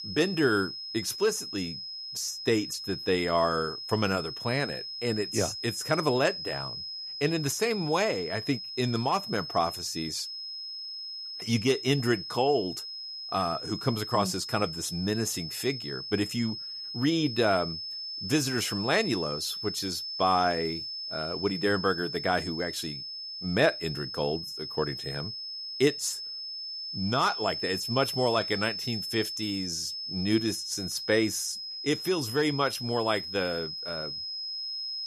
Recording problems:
high-pitched whine; loud; throughout; 5 kHz, 6 dB below the speech

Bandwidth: 14.5 kHz